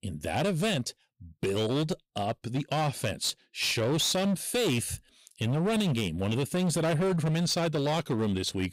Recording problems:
distortion; slight; 18% of the sound clipped

